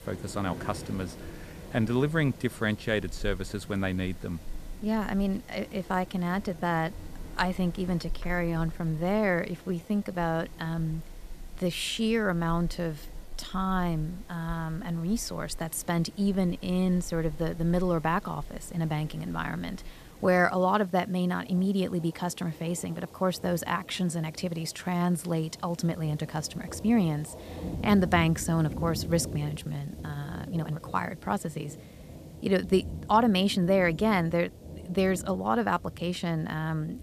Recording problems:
rain or running water; noticeable; throughout; 15 dB below the speech
hiss; faint; throughout; 30 dB below the speech
uneven, jittery; strongly; from 5 to 36 s

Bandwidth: 14.5 kHz